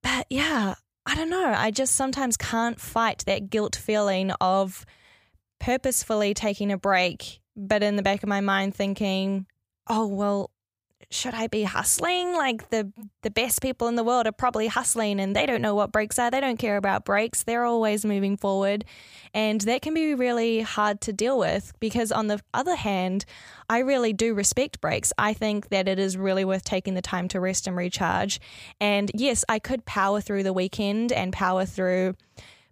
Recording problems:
none

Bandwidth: 15 kHz